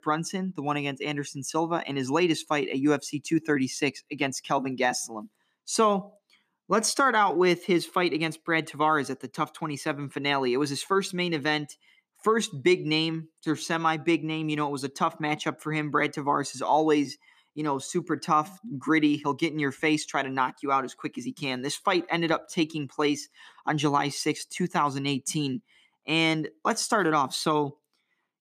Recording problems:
none

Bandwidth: 14.5 kHz